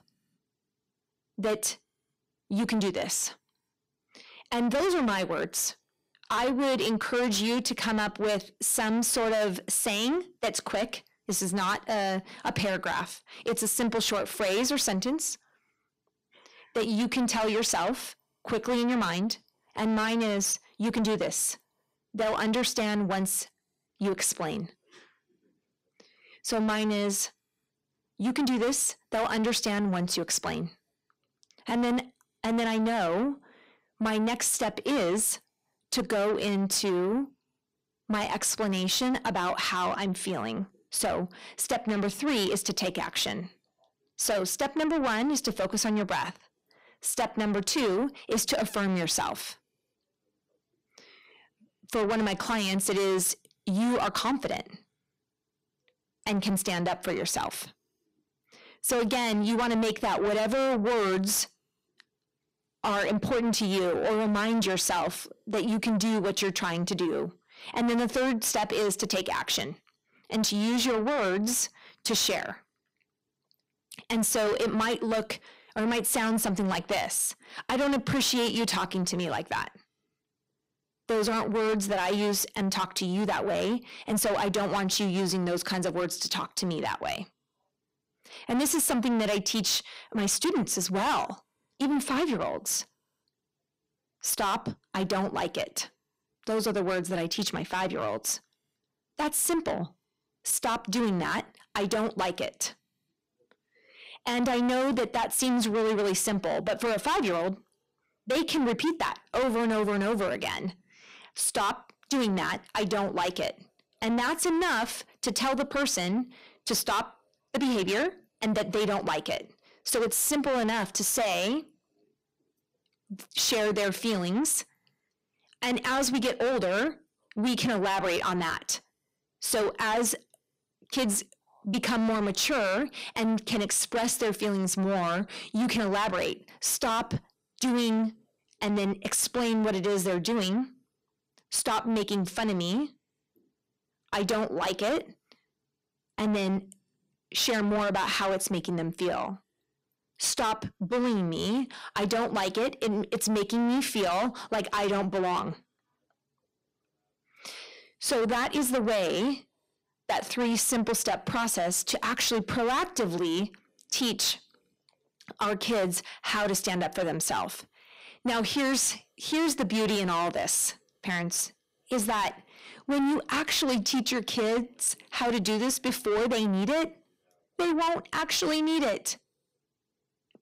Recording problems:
distortion; heavy; 6 dB below the speech

